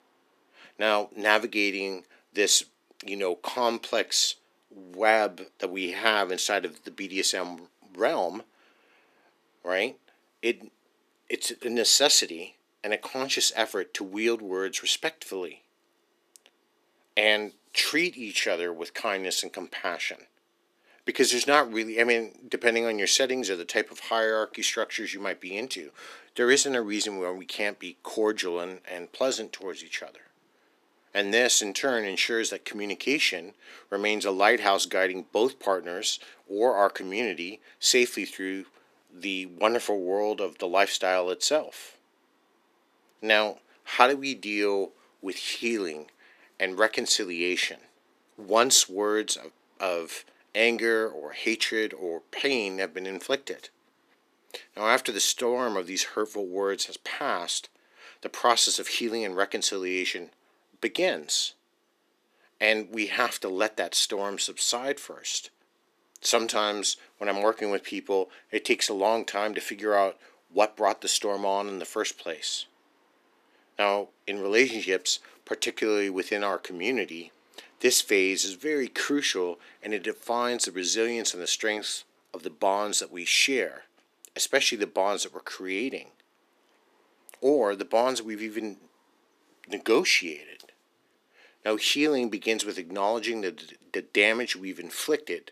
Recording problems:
thin; somewhat; fading below 300 Hz

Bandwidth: 14.5 kHz